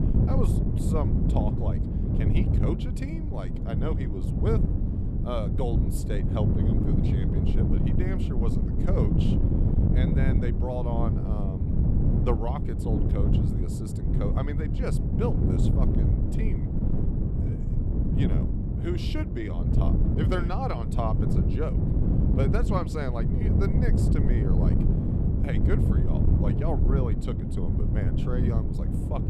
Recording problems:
wind noise on the microphone; heavy; as loud as the speech

